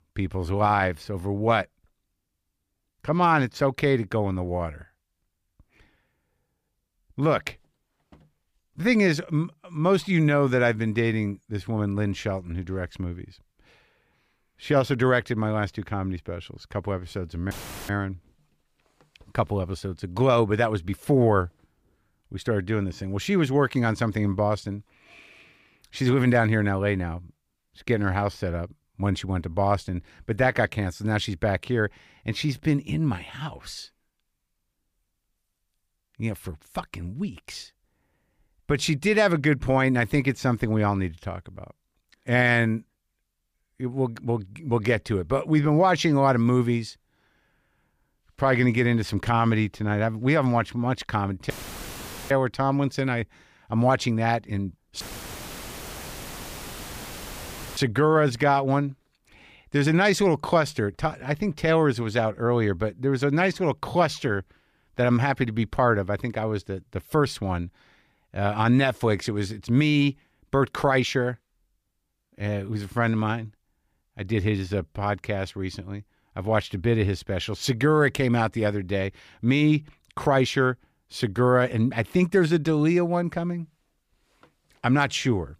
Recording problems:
audio cutting out; filled with static; at 18 s, at 52 s for 1 s and at 55 s for 3 s

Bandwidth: 15 kHz